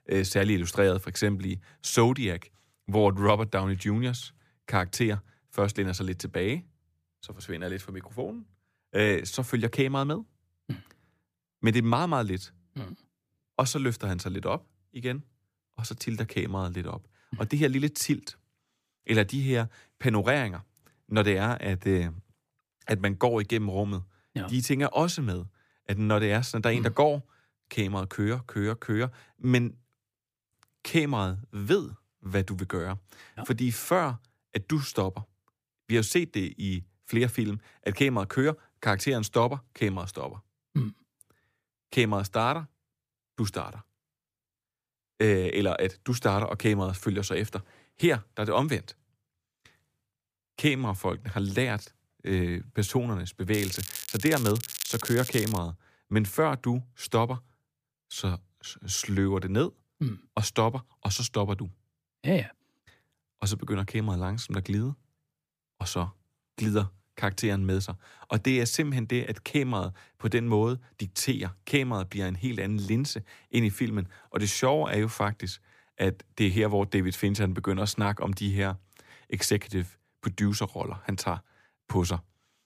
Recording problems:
crackling; loud; from 54 to 56 s; 6 dB below the speech

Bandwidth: 15 kHz